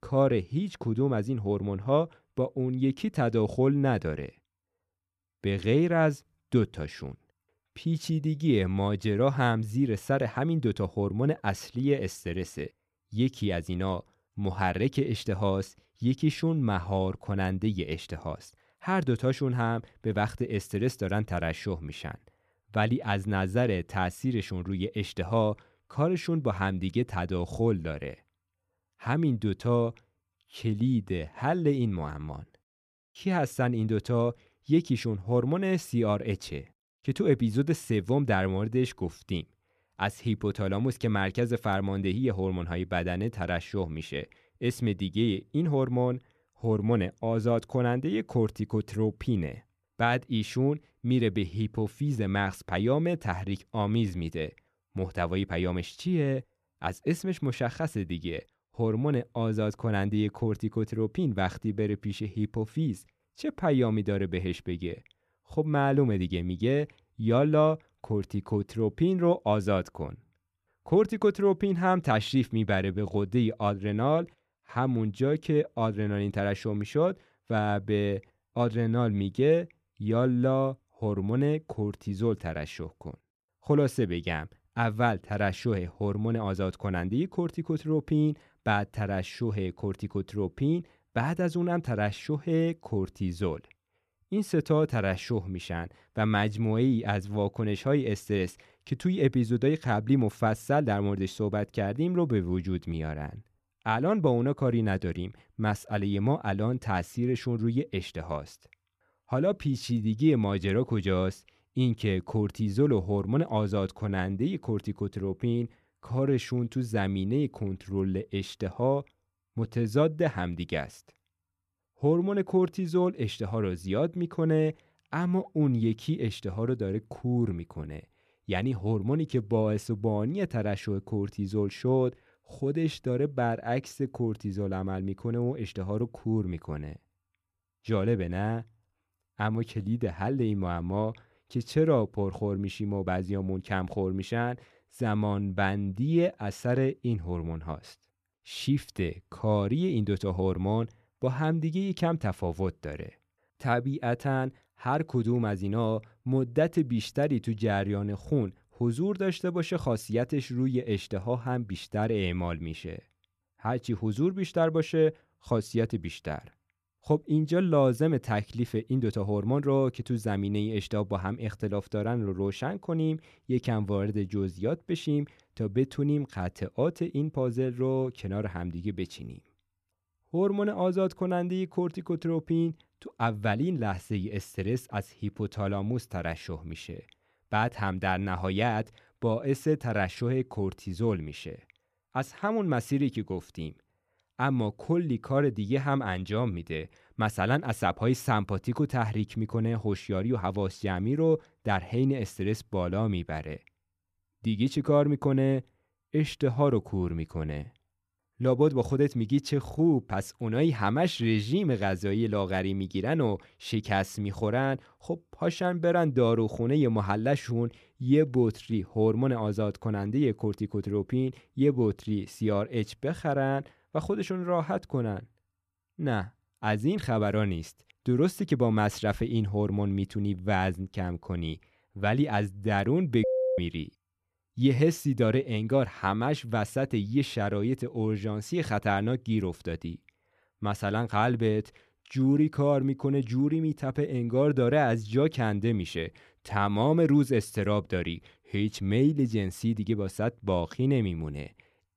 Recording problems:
none

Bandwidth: 14 kHz